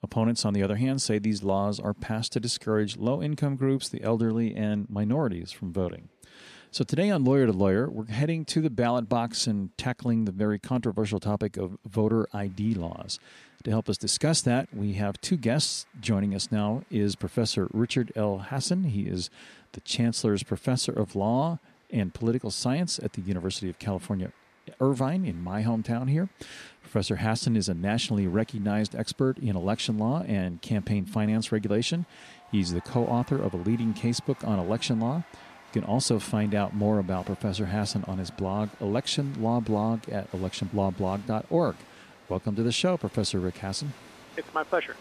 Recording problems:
crowd noise; faint; throughout; 25 dB below the speech

